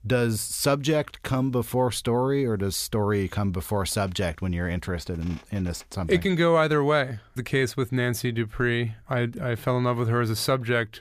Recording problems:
none

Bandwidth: 15 kHz